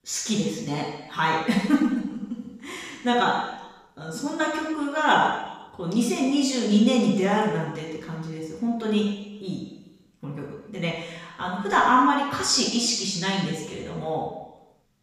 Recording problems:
off-mic speech; far
room echo; noticeable; dies away in 1 s

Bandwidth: 15 kHz